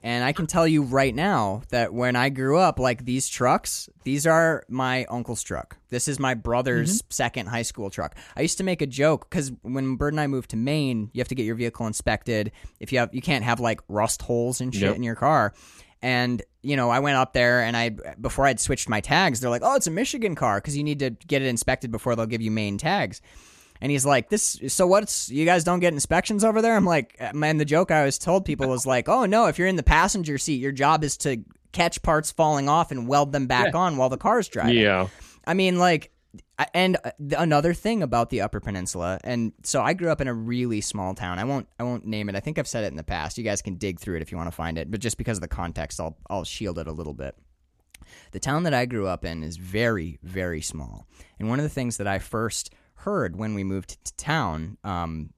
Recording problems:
none

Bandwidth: 14 kHz